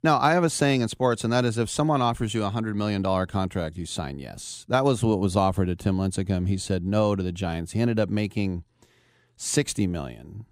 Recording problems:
none

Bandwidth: 15.5 kHz